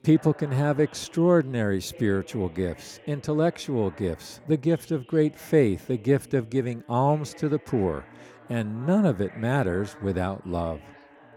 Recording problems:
background chatter; faint; throughout; 2 voices, 20 dB below the speech

